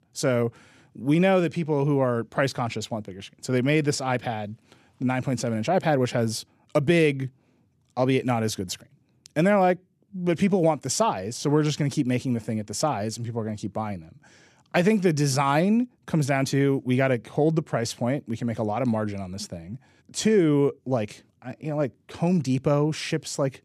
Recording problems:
none

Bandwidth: 13.5 kHz